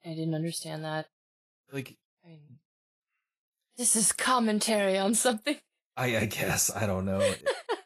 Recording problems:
garbled, watery; slightly; nothing above 11.5 kHz

